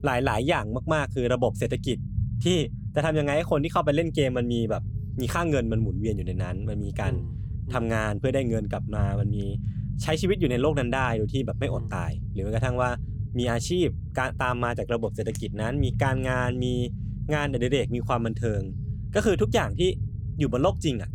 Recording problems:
low rumble; noticeable; throughout; 15 dB below the speech

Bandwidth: 17 kHz